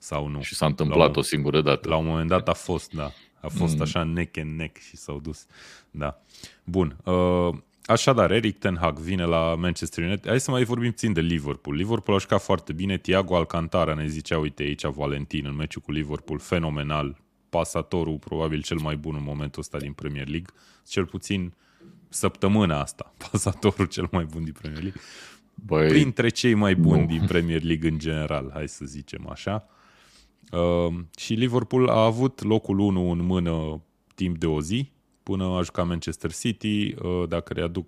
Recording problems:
none

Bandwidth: 15 kHz